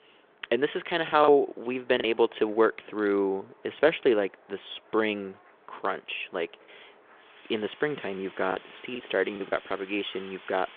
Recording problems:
phone-call audio
wind in the background; faint; throughout; 25 dB below the speech
choppy; very; at 1 s and from 8.5 to 9.5 s; 7% of the speech affected

